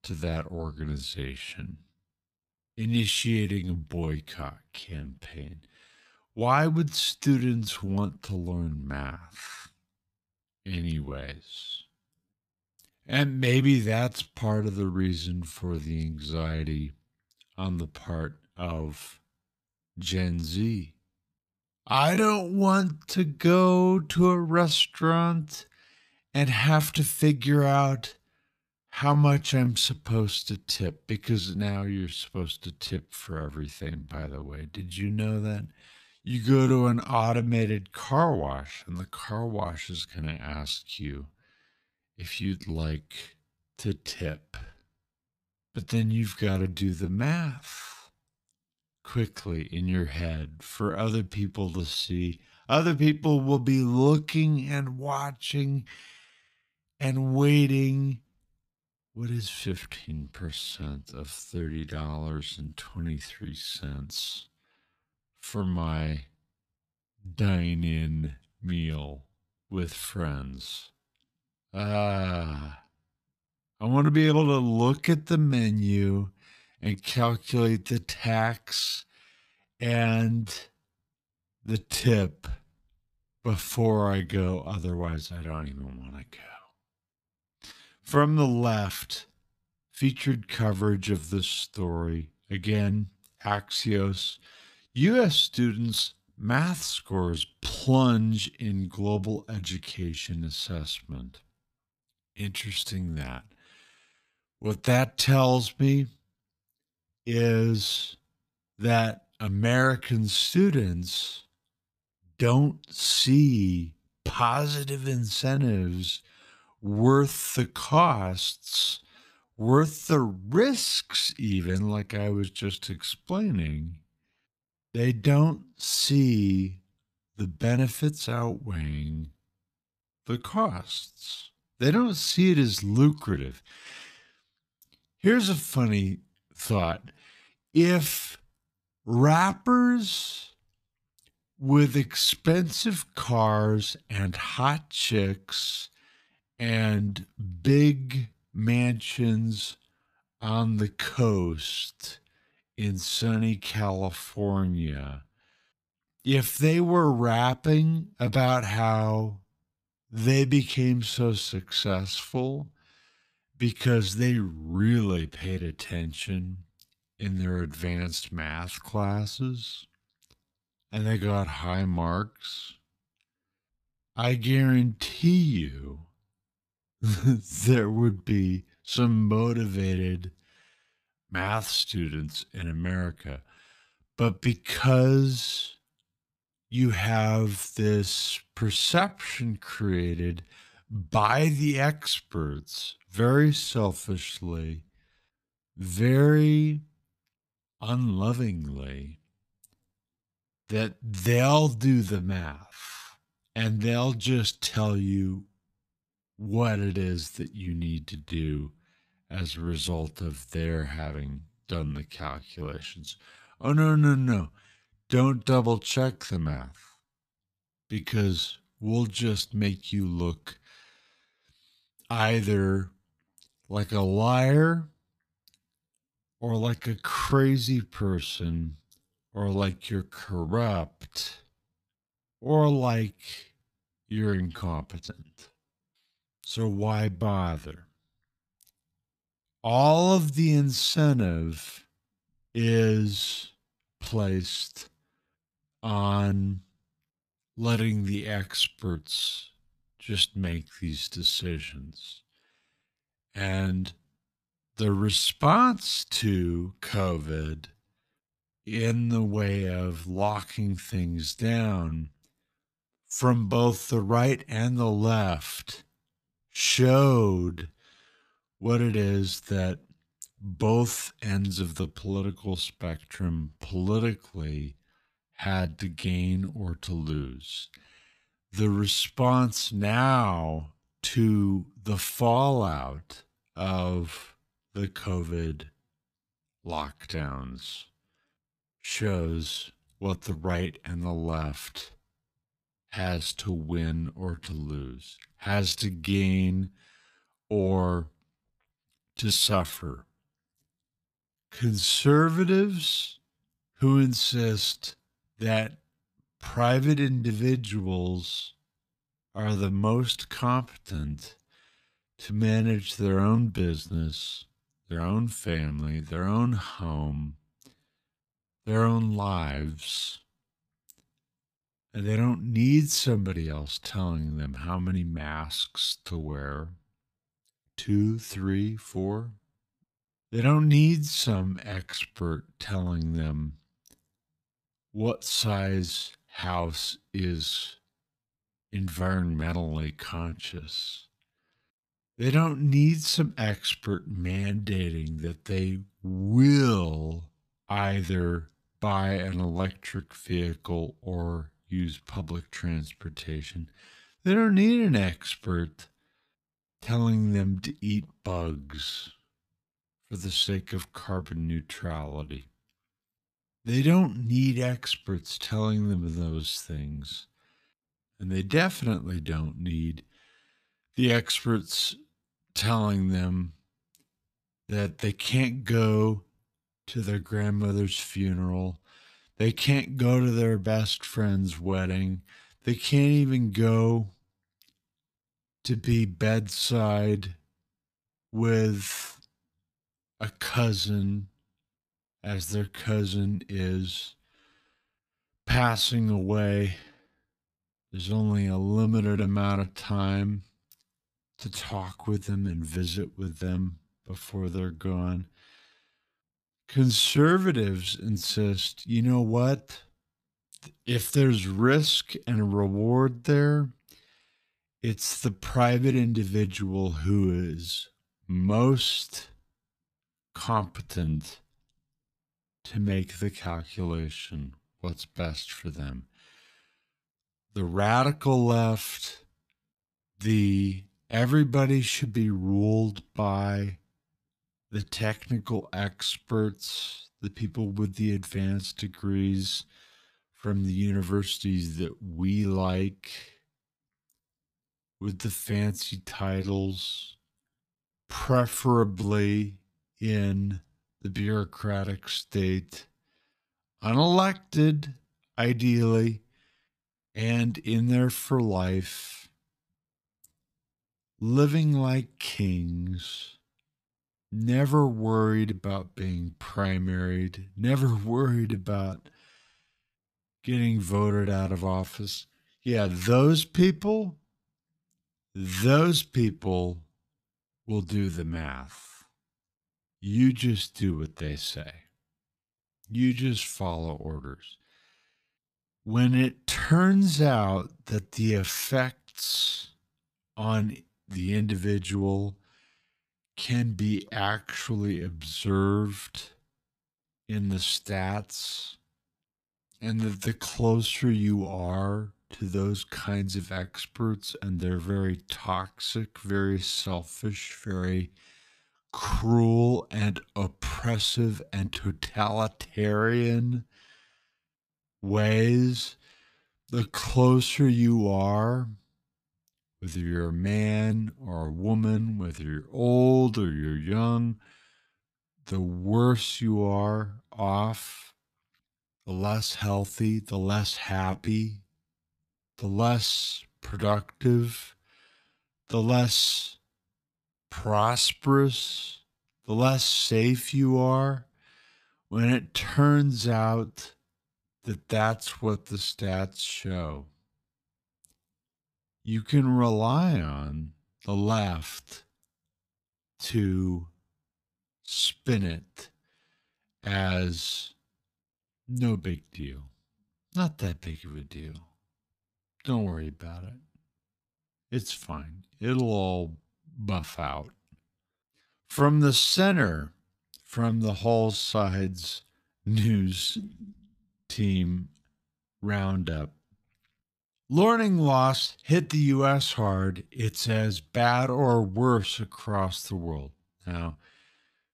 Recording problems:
wrong speed, natural pitch; too slow; 0.6 times normal speed

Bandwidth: 14.5 kHz